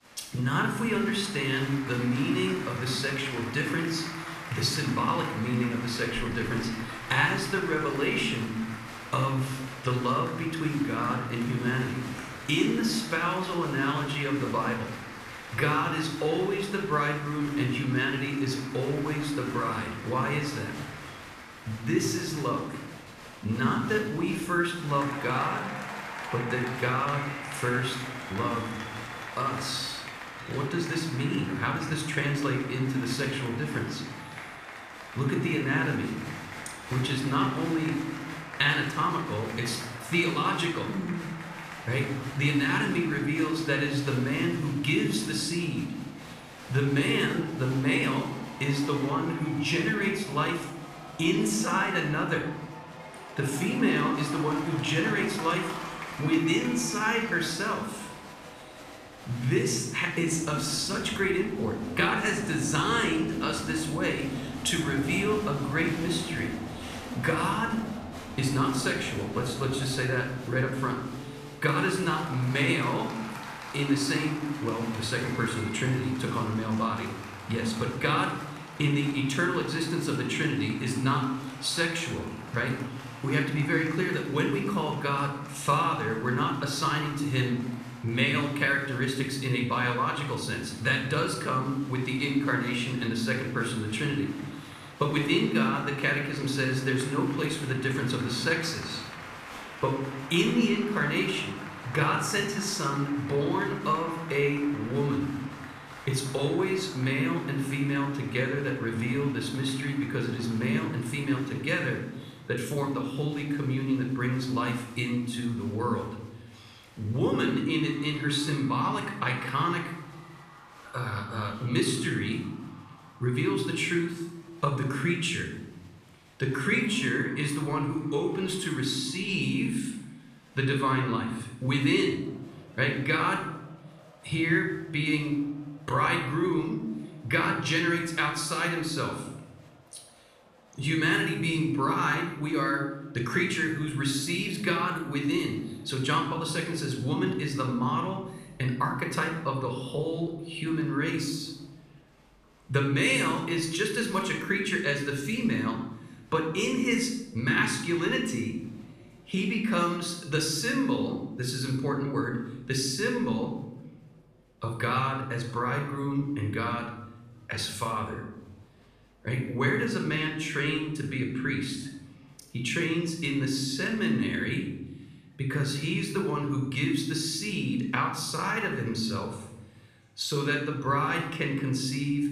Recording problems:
room echo; noticeable; dies away in 0.9 s
off-mic speech; somewhat distant
crowd noise; noticeable; throughout; 15 dB below the speech

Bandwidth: 14.5 kHz